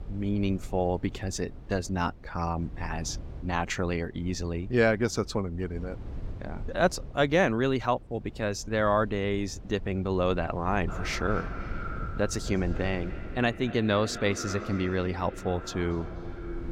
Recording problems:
echo of what is said; strong; from 11 s on; 230 ms later, 10 dB below the speech
low rumble; faint; throughout; 25 dB below the speech

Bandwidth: 16 kHz